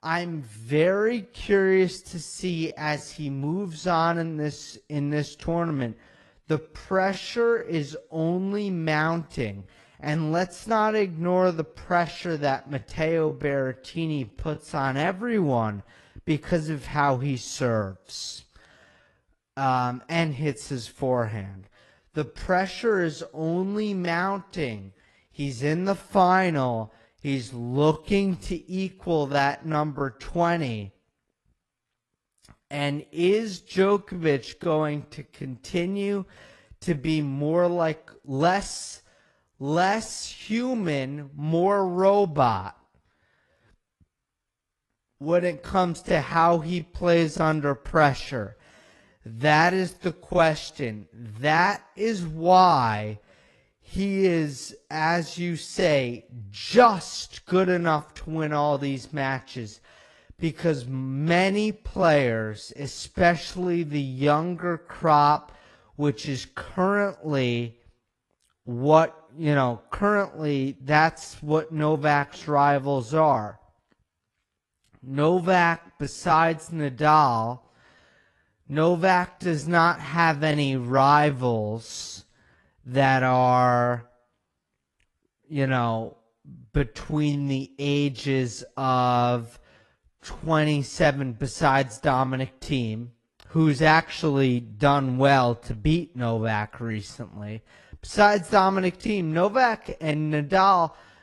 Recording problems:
wrong speed, natural pitch; too slow; 0.6 times normal speed
garbled, watery; slightly; nothing above 11 kHz

